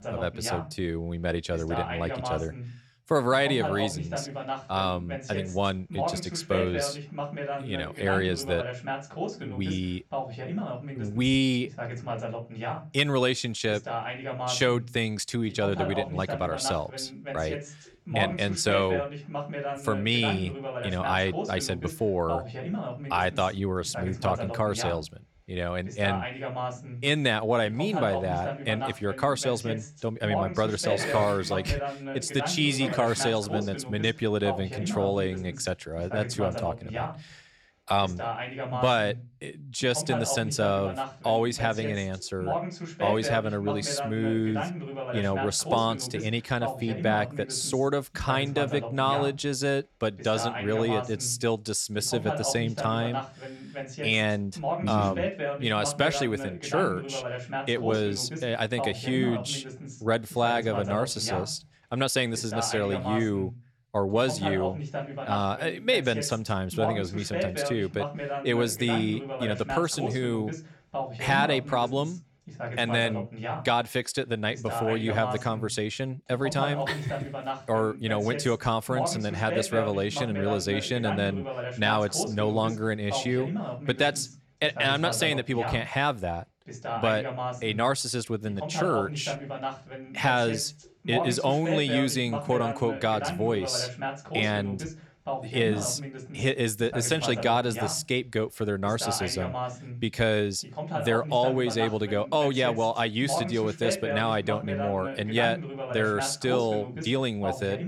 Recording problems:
voice in the background; loud; throughout; 6 dB below the speech

